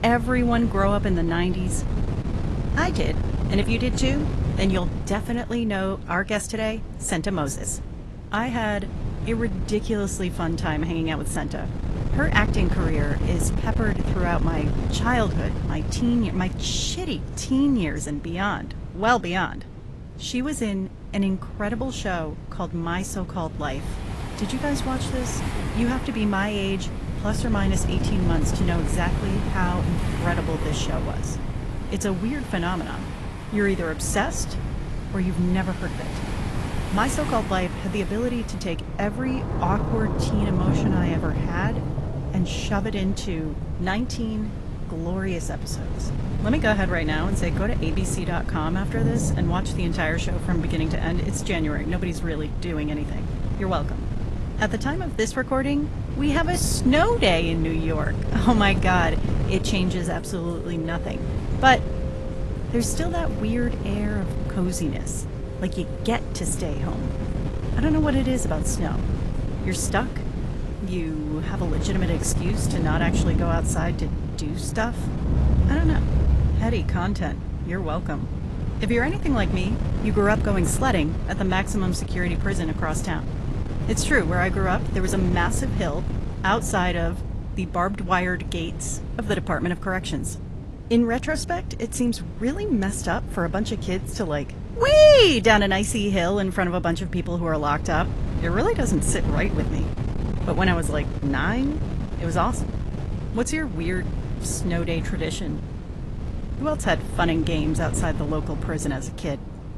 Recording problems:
garbled, watery; slightly; nothing above 11.5 kHz
rain or running water; loud; from 24 s on; 8 dB below the speech
wind noise on the microphone; occasional gusts; 10 dB below the speech

